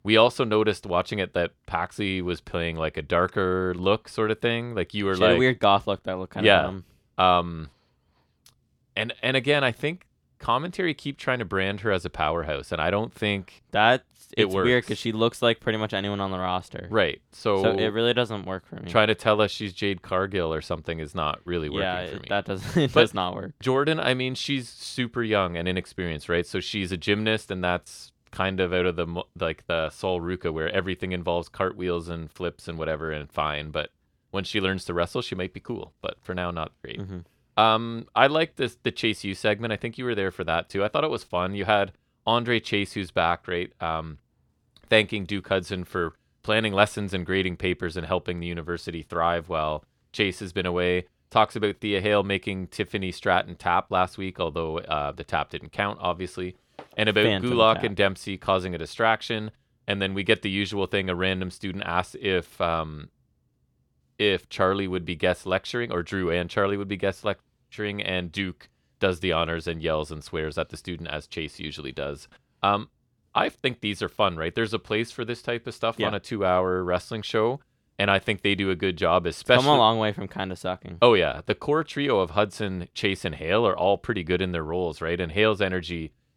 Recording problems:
none

